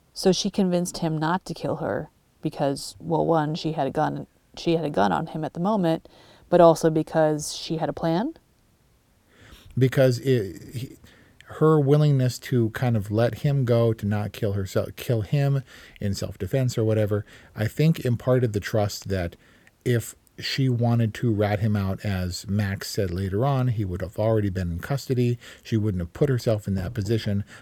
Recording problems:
none

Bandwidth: 18 kHz